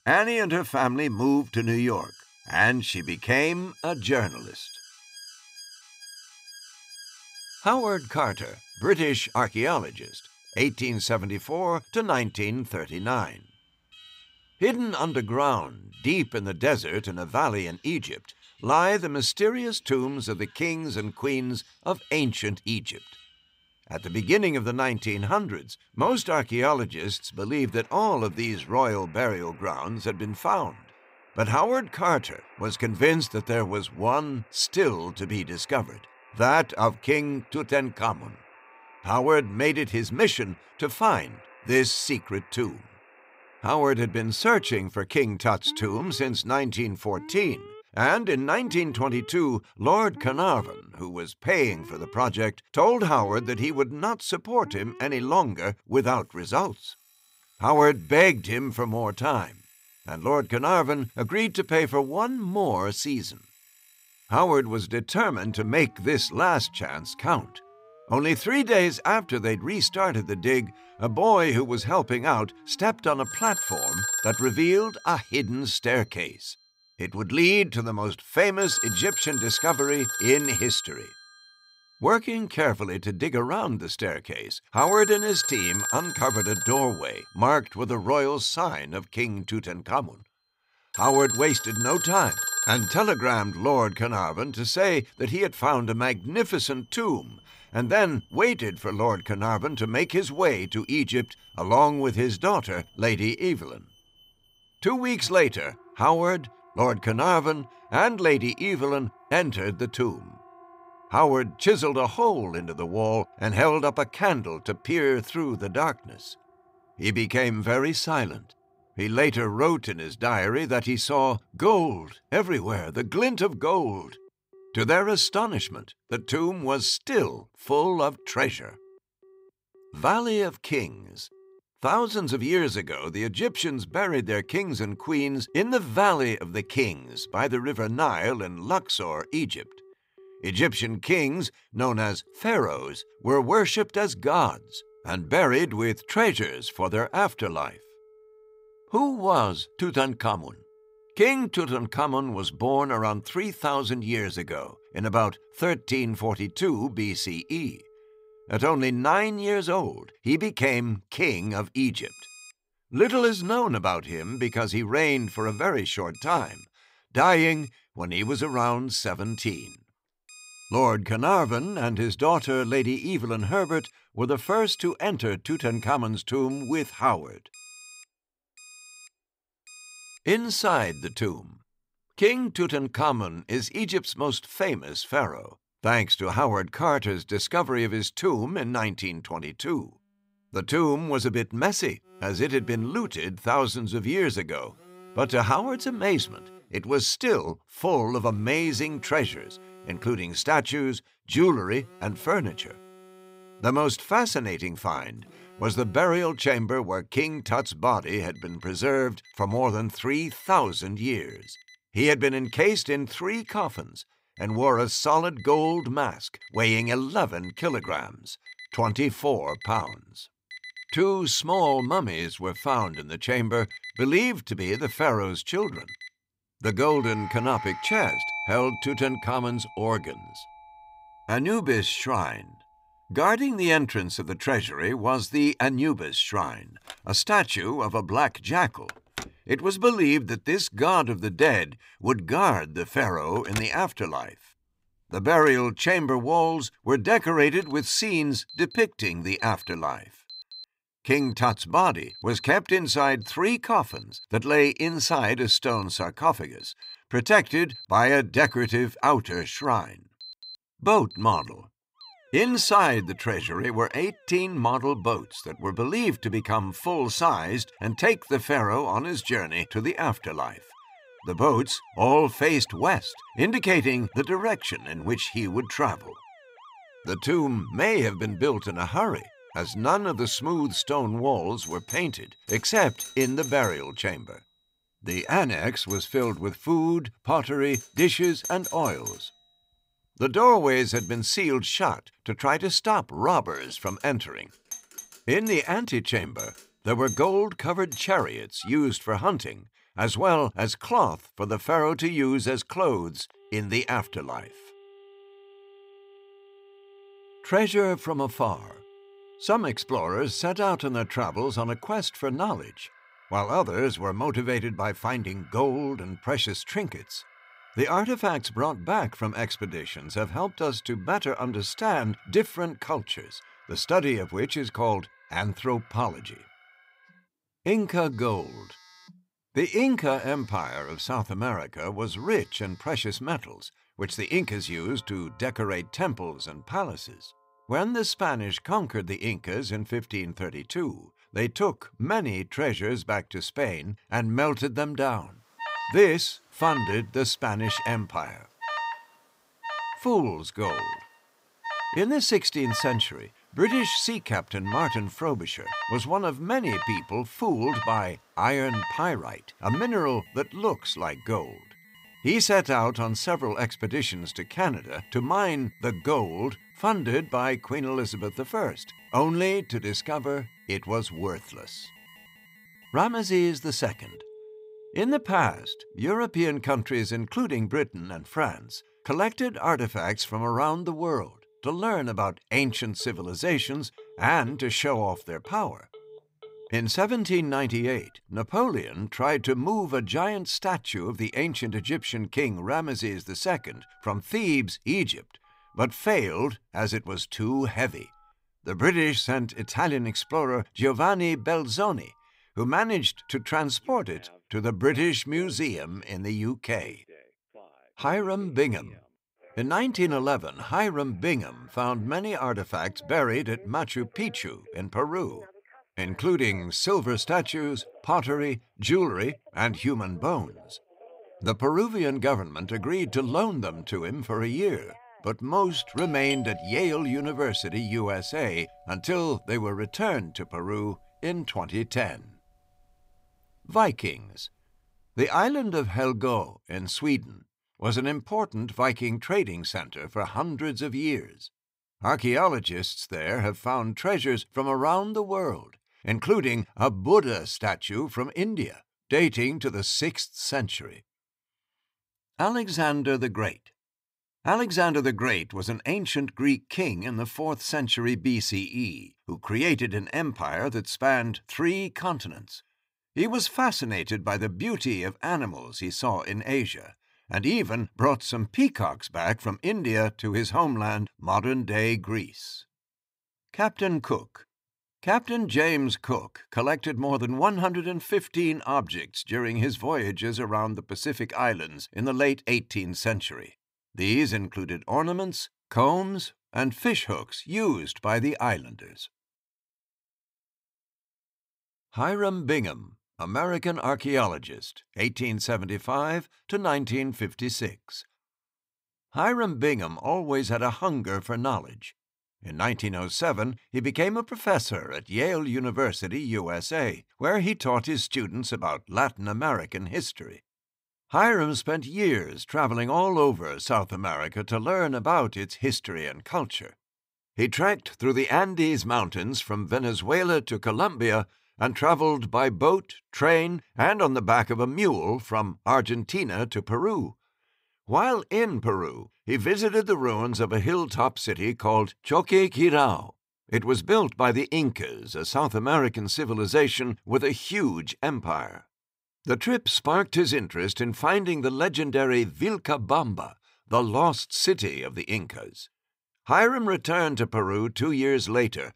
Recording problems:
alarms or sirens; noticeable; until 7:15; 10 dB below the speech

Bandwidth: 15.5 kHz